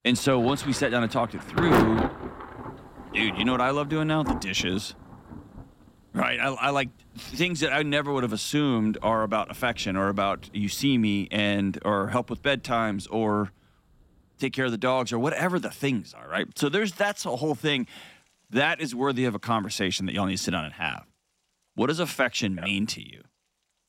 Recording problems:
rain or running water; loud; throughout; 6 dB below the speech

